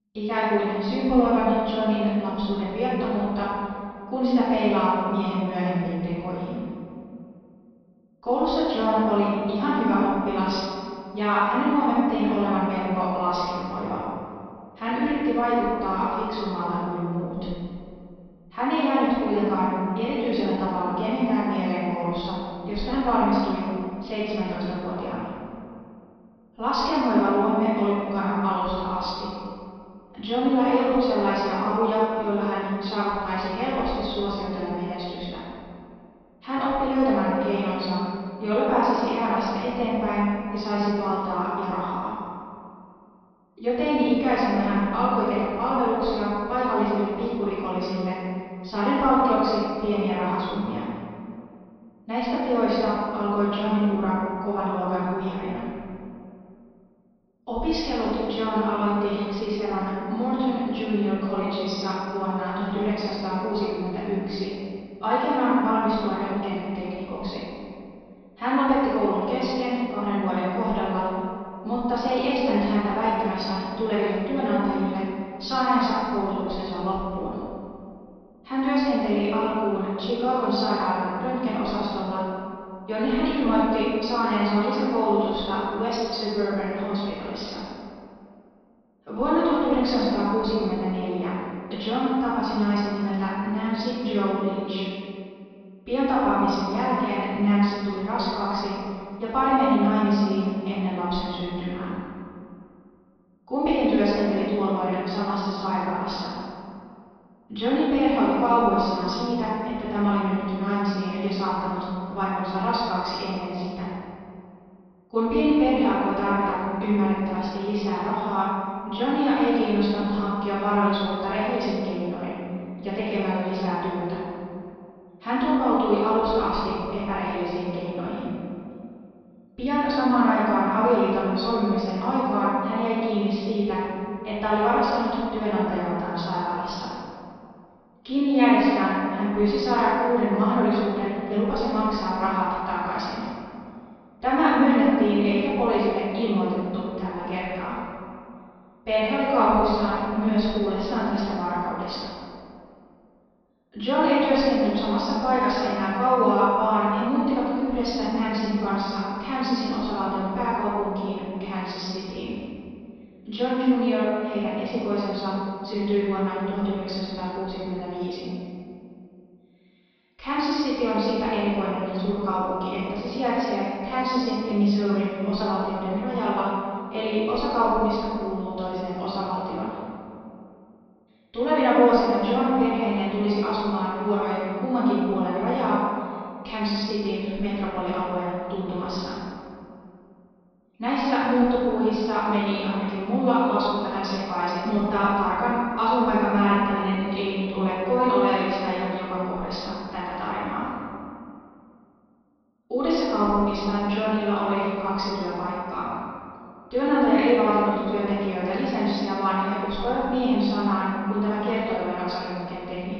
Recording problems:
room echo; strong; dies away in 2.2 s
off-mic speech; far
high frequencies cut off; noticeable; nothing above 5.5 kHz

